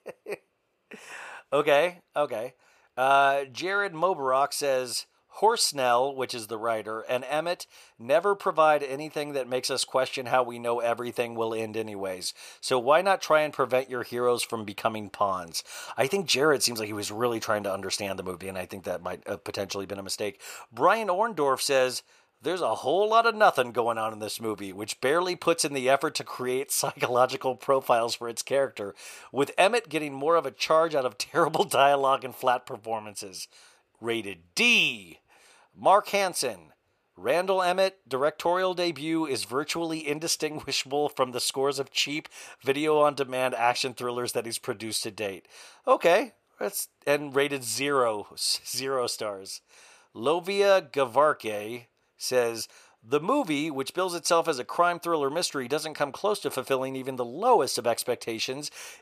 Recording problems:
thin; very slightly; fading below 1 kHz

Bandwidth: 14.5 kHz